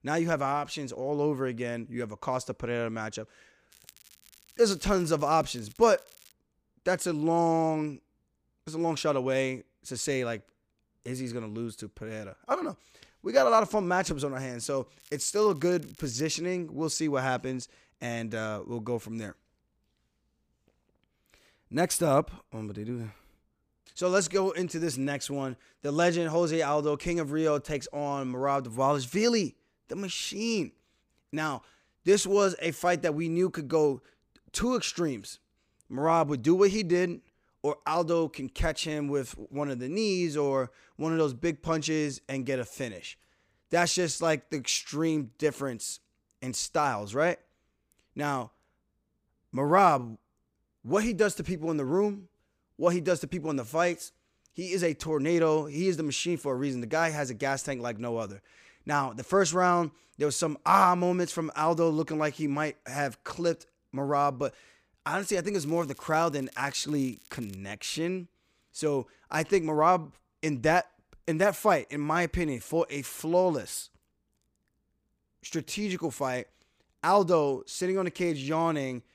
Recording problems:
crackling; faint; from 3.5 to 6.5 s, from 15 to 16 s and from 1:06 to 1:08; 25 dB below the speech

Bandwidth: 15 kHz